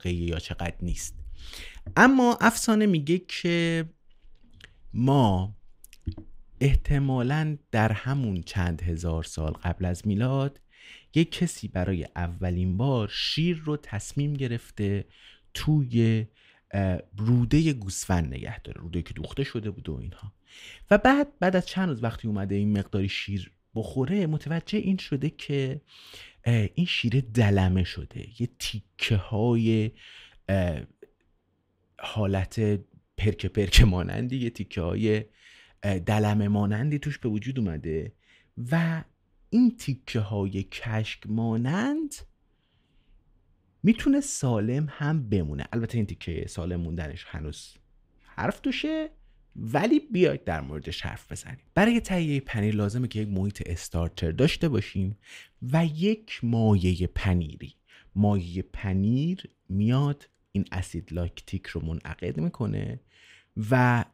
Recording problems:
none

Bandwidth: 15.5 kHz